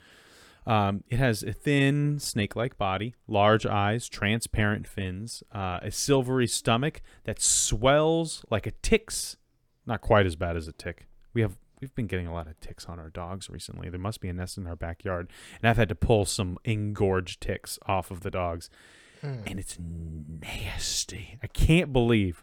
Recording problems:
none

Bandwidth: 18.5 kHz